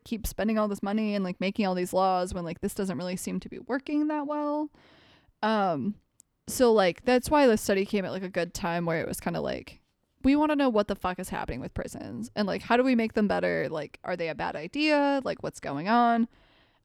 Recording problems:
none

